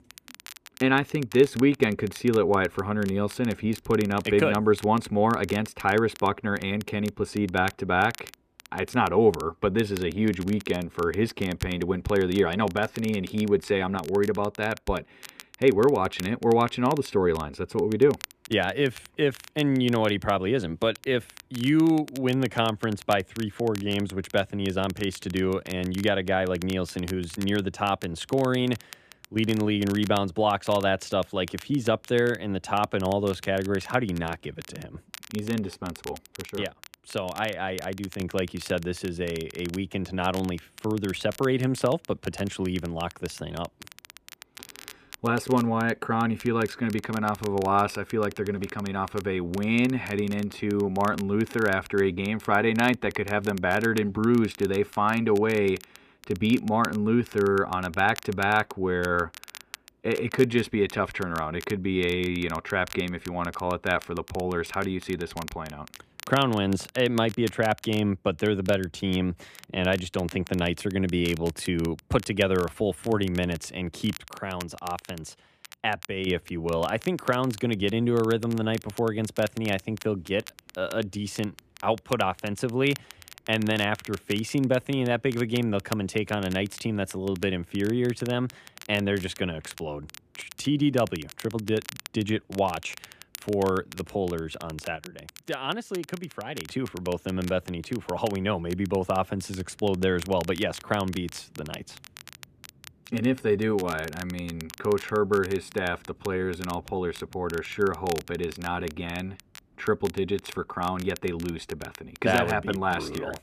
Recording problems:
muffled; slightly; fading above 3.5 kHz
crackle, like an old record; noticeable; 20 dB below the speech

